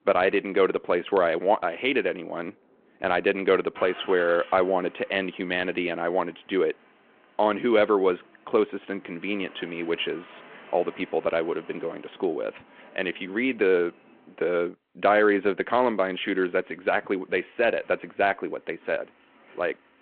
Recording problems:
phone-call audio
traffic noise; faint; throughout; 25 dB below the speech

